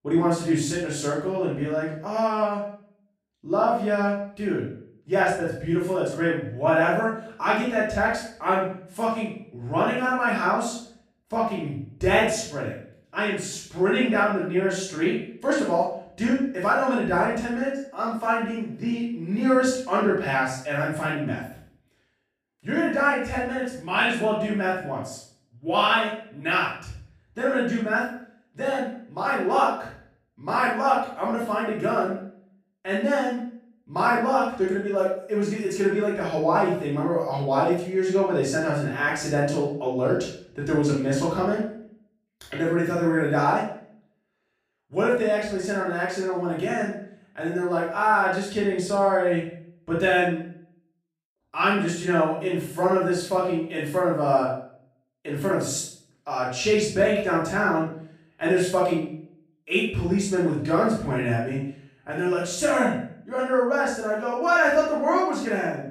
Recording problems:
off-mic speech; far
room echo; noticeable; dies away in 0.5 s

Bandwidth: 15 kHz